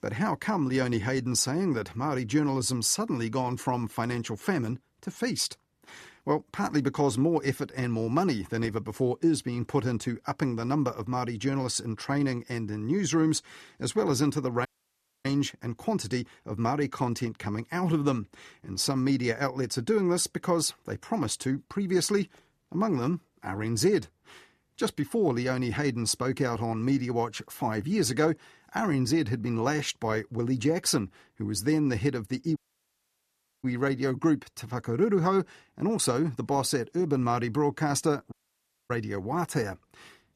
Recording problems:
audio cutting out; at 15 s for 0.5 s, at 33 s for 1 s and at 38 s for 0.5 s

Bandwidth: 14 kHz